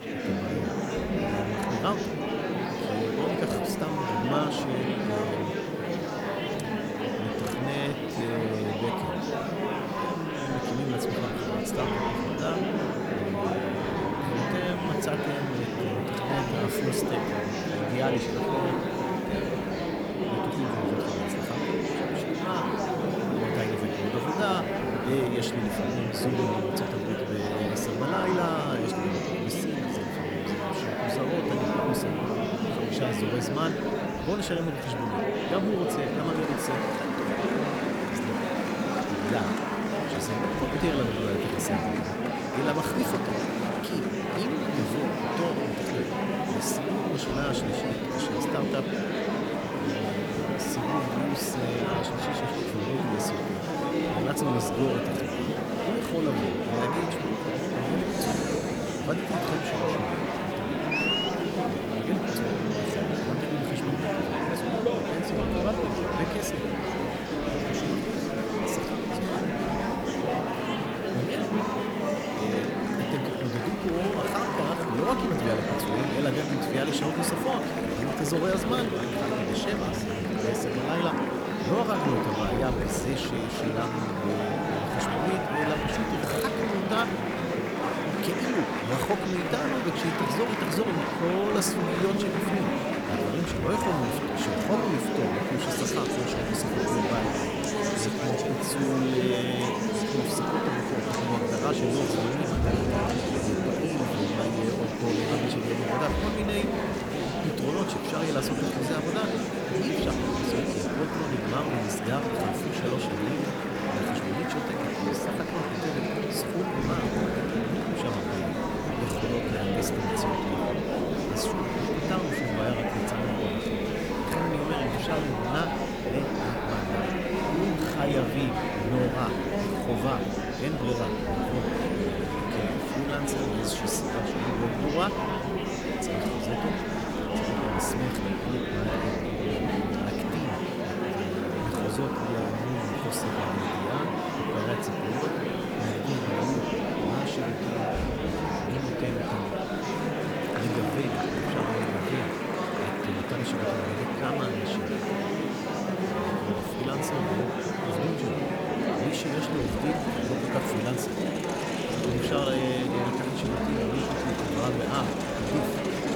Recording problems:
murmuring crowd; very loud; throughout; 4 dB above the speech
hiss; faint; throughout; 25 dB below the speech

